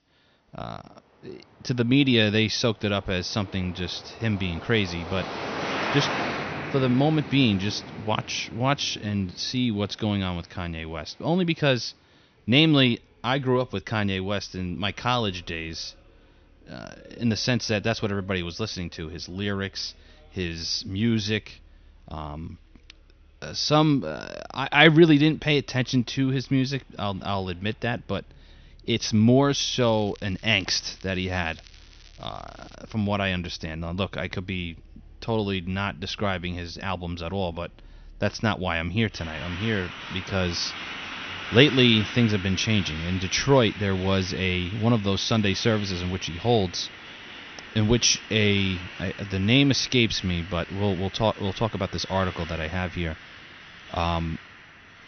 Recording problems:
high frequencies cut off; noticeable; nothing above 6 kHz
traffic noise; noticeable; throughout; 10 dB below the speech
crackling; faint; from 30 to 33 s; 25 dB below the speech

